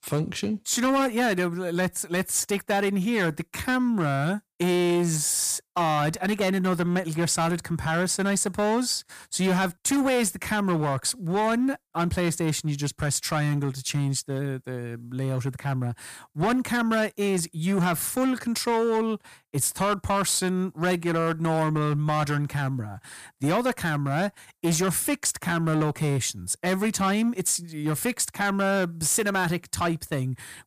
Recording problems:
distortion; slight; 10% of the sound clipped

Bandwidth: 15 kHz